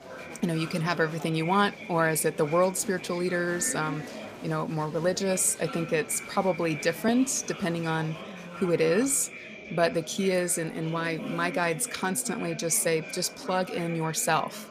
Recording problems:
murmuring crowd; noticeable; throughout; 15 dB below the speech

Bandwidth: 15 kHz